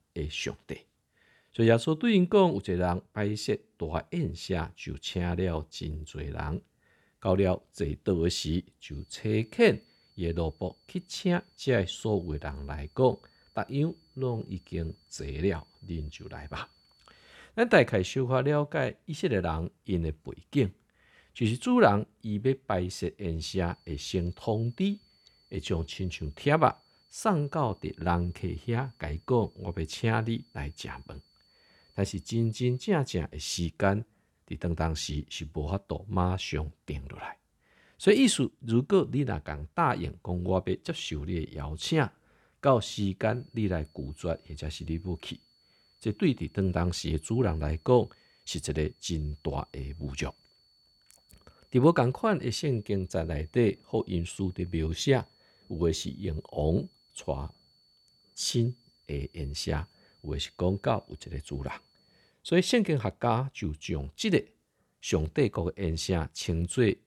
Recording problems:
high-pitched whine; faint; from 9 to 17 s, from 24 to 33 s and from 43 s to 1:02; 4.5 kHz, 35 dB below the speech

